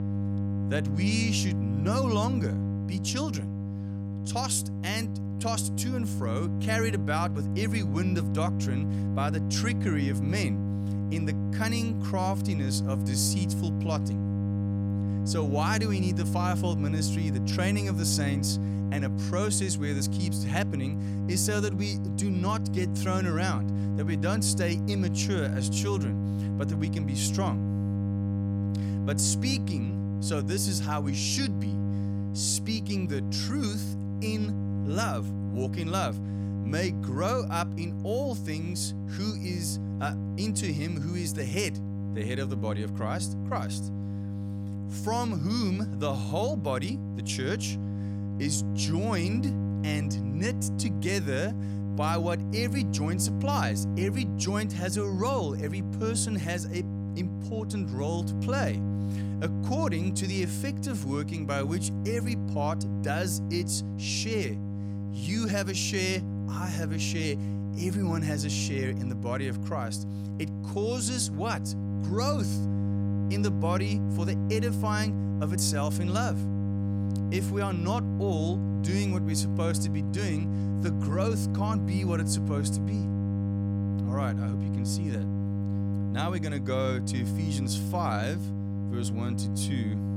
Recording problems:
electrical hum; loud; throughout; 50 Hz, 7 dB below the speech

